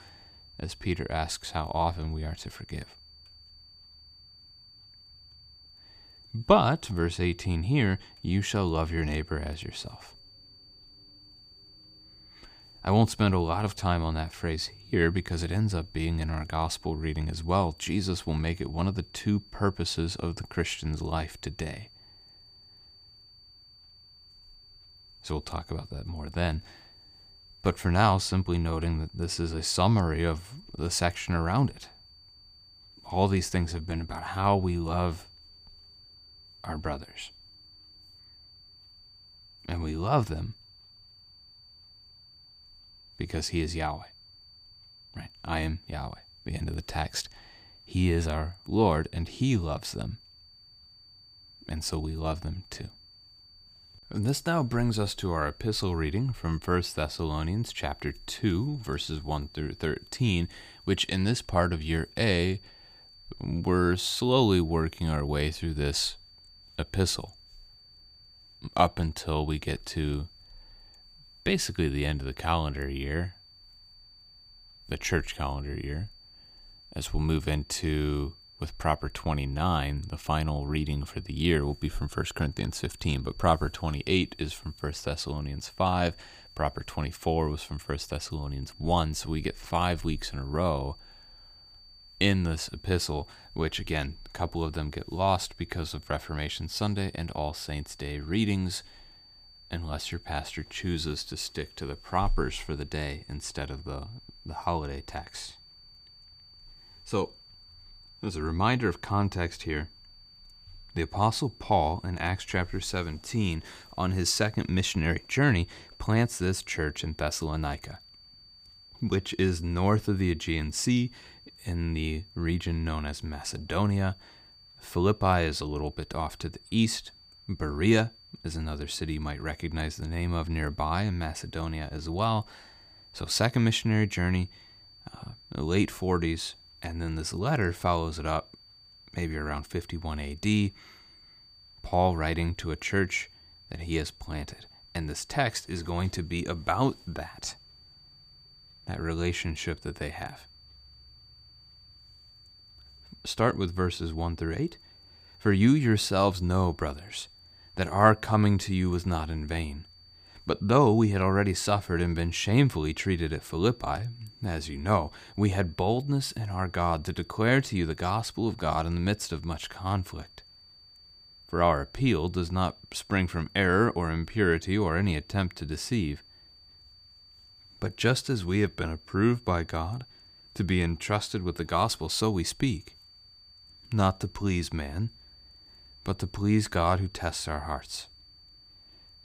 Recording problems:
high-pitched whine; faint; throughout; 4.5 kHz, 25 dB below the speech

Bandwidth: 15 kHz